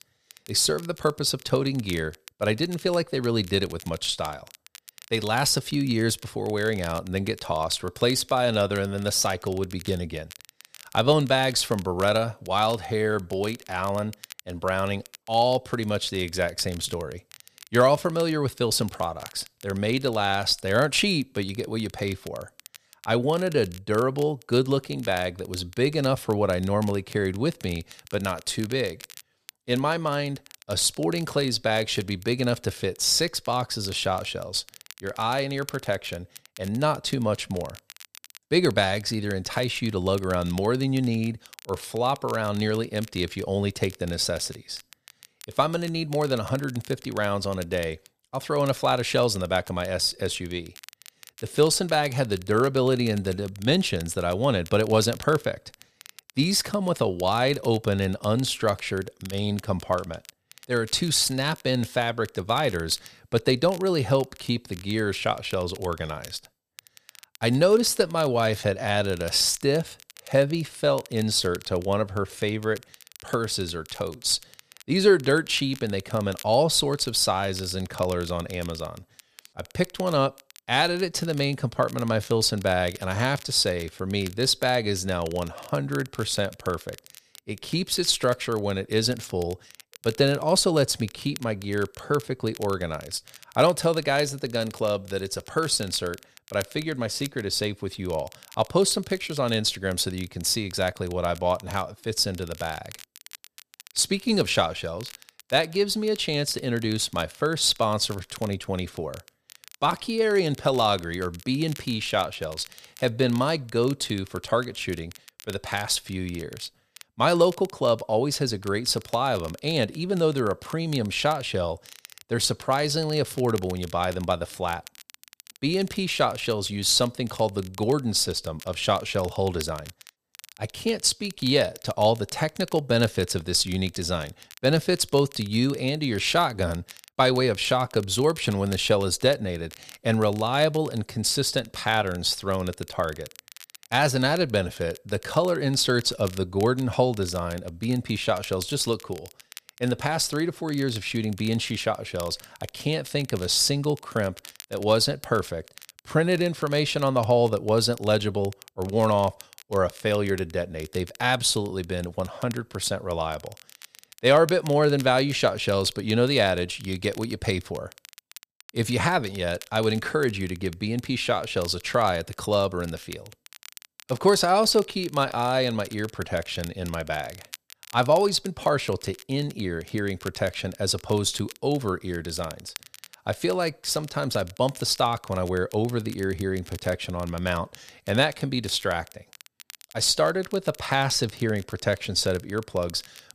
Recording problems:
crackle, like an old record; faint; 20 dB below the speech

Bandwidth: 14.5 kHz